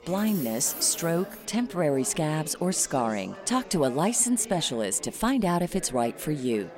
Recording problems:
chatter from many people; noticeable; throughout; 15 dB below the speech
jangling keys; noticeable; until 1.5 s; peak 8 dB below the speech

